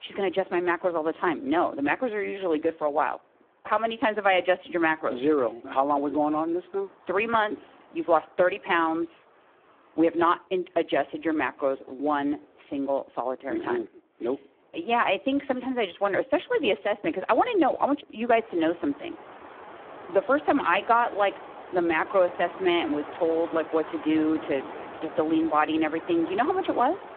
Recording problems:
phone-call audio; poor line
wind in the background; noticeable; throughout; 15 dB below the speech

